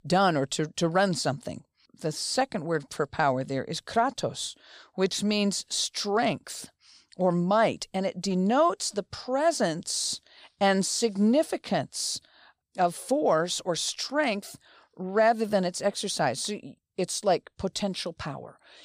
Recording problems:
none

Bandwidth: 15 kHz